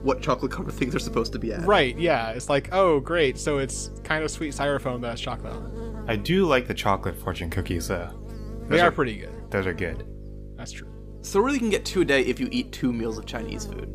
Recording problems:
electrical hum; noticeable; throughout; 50 Hz, 20 dB below the speech

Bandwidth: 15 kHz